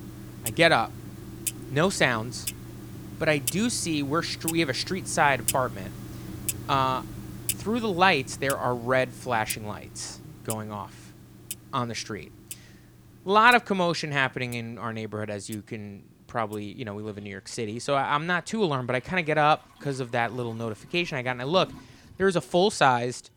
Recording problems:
household noises; noticeable; throughout; 10 dB below the speech

